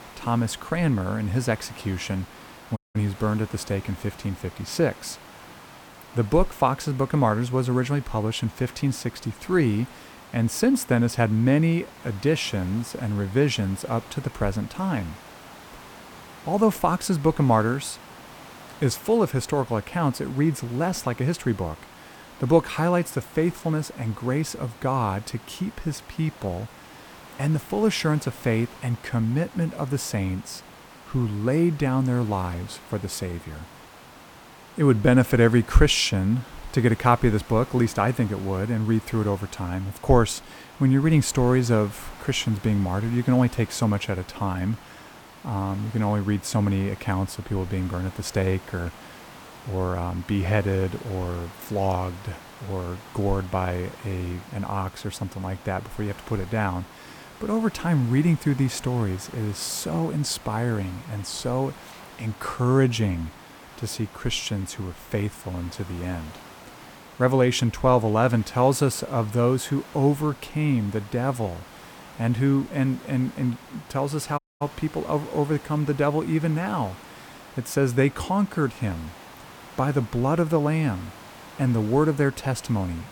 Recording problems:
hiss; noticeable; throughout; 20 dB below the speech
audio cutting out; at 3 s and at 1:14

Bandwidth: 18.5 kHz